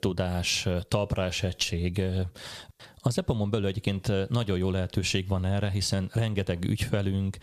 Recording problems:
squashed, flat; somewhat

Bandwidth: 14.5 kHz